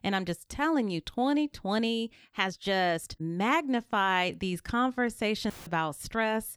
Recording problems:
uneven, jittery; strongly; from 1 to 5 s
audio cutting out; filled with static; at 5.5 s

